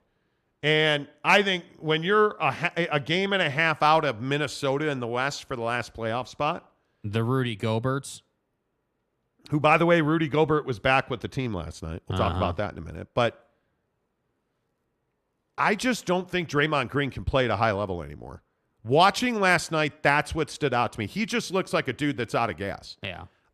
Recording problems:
none

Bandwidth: 14.5 kHz